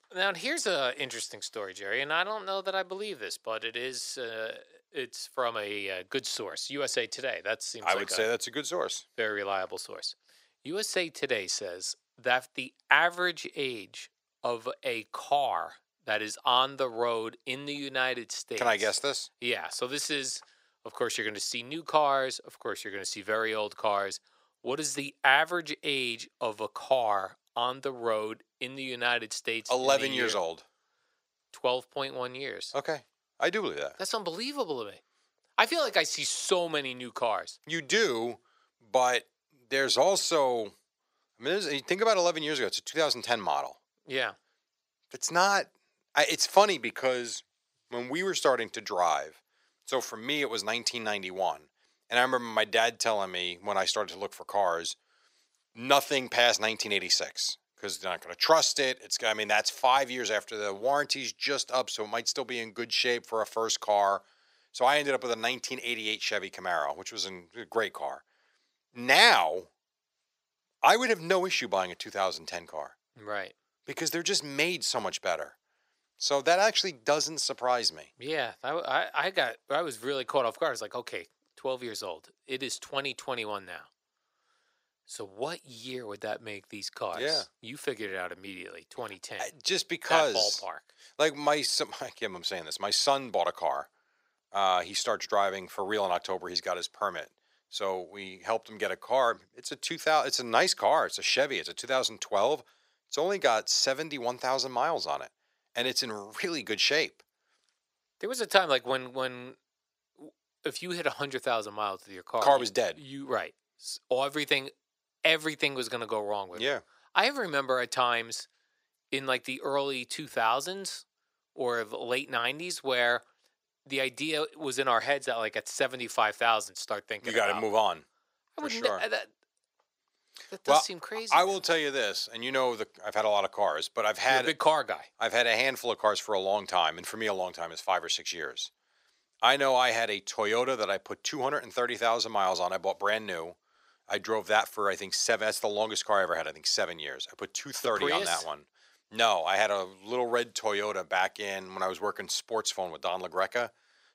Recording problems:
thin; very; fading below 500 Hz

